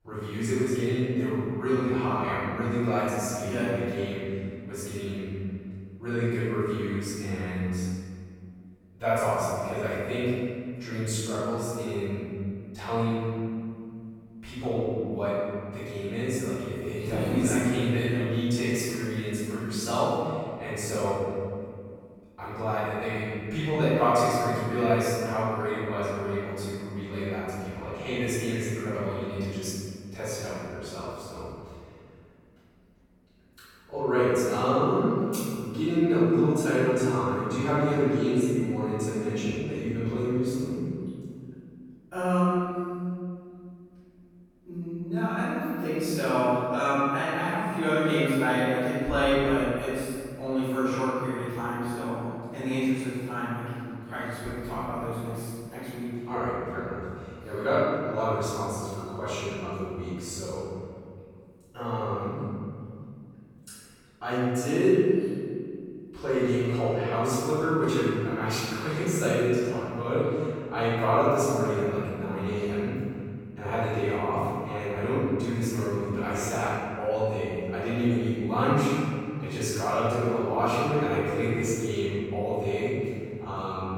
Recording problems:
room echo; strong; dies away in 2.3 s
off-mic speech; far

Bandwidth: 17.5 kHz